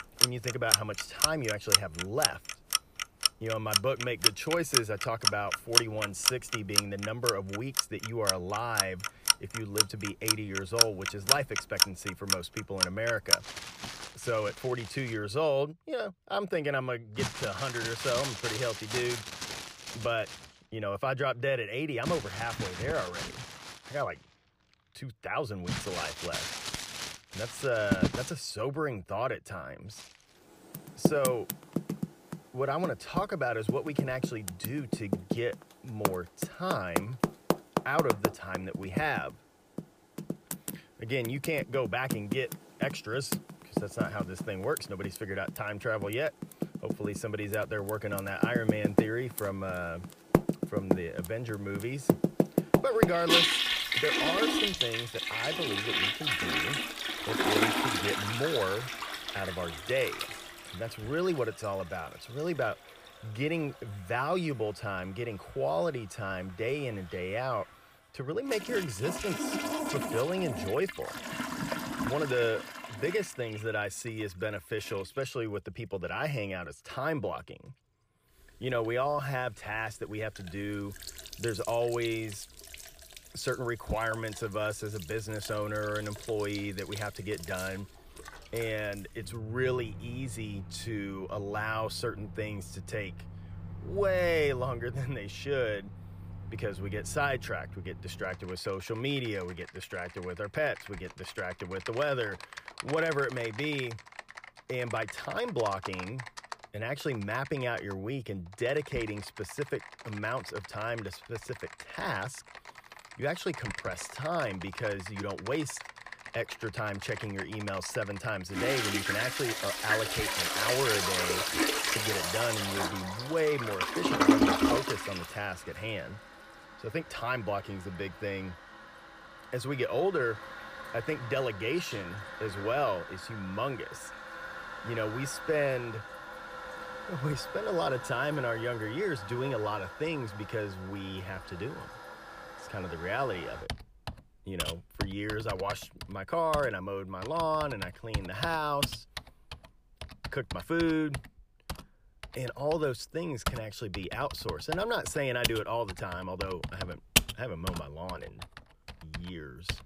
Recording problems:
household noises; very loud; throughout; 2 dB above the speech

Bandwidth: 15 kHz